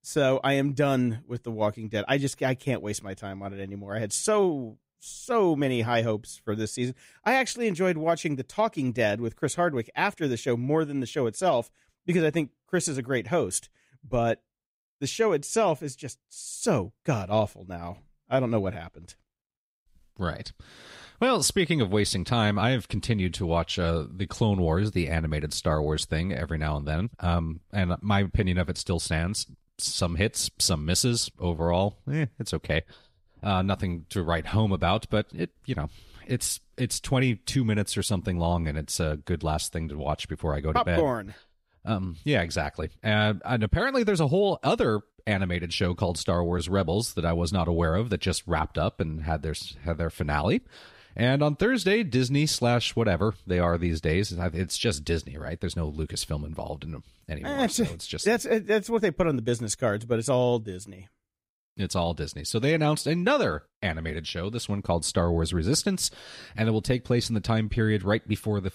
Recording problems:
none

